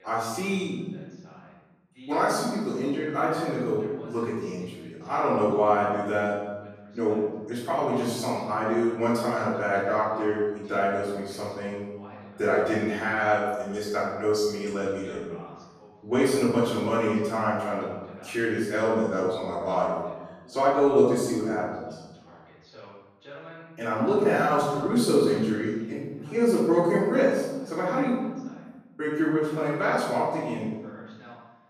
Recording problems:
room echo; strong; dies away in 1.2 s
off-mic speech; far
voice in the background; faint; throughout; 25 dB below the speech

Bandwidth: 14.5 kHz